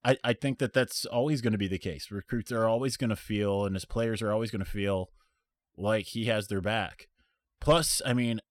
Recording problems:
none

